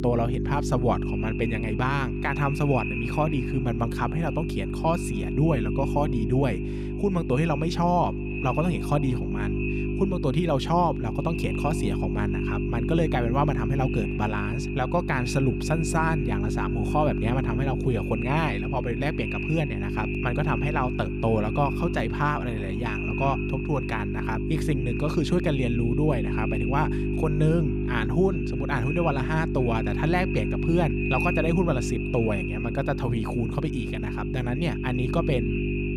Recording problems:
echo of what is said; strong; throughout; 280 ms later, 10 dB below the speech
electrical hum; loud; throughout; 50 Hz, 6 dB below the speech

